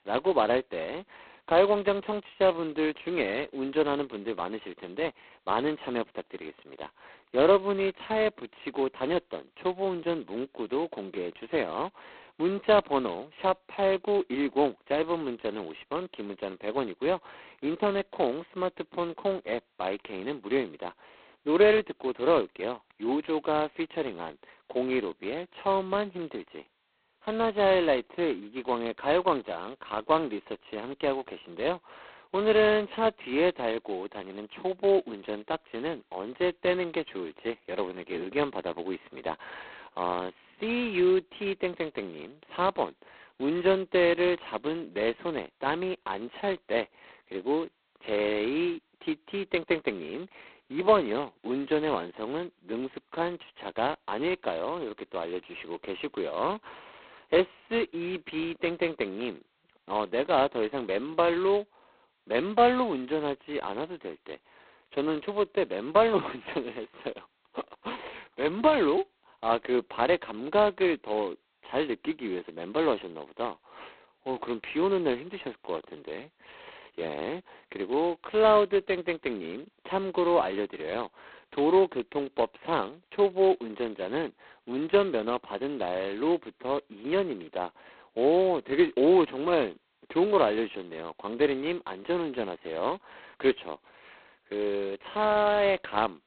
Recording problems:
phone-call audio; poor line; nothing above 4 kHz

